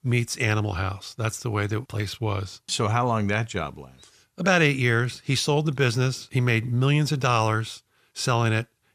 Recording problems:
none

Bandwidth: 14.5 kHz